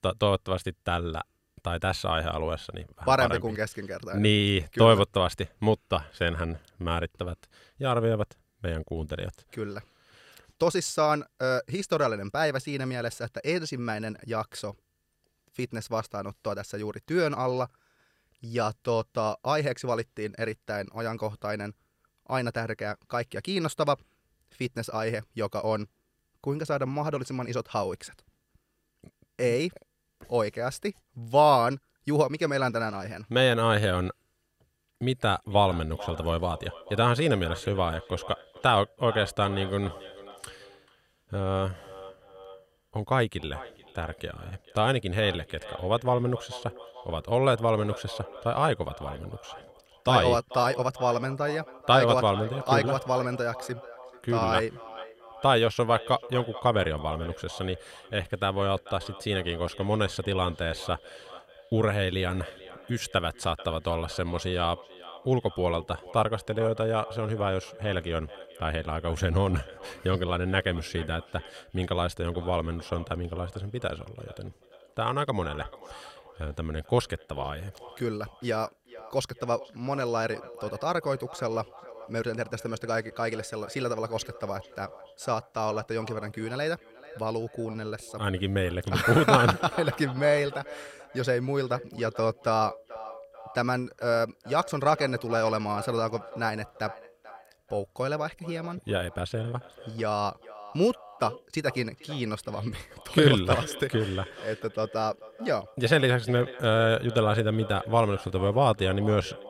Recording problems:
echo of what is said; noticeable; from 35 s on; 440 ms later, 15 dB below the speech

